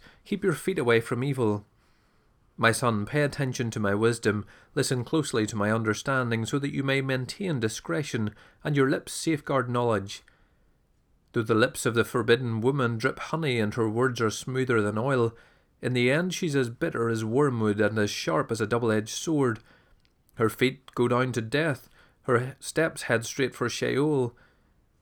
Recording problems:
none

